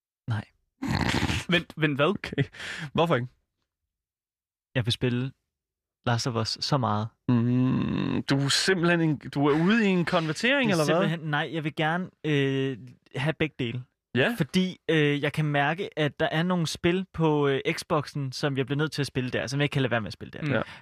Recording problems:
none

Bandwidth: 14.5 kHz